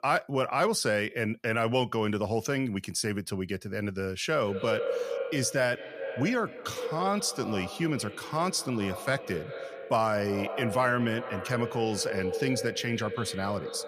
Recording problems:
echo of what is said; strong; from 4.5 s on; 190 ms later, 8 dB below the speech

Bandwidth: 14.5 kHz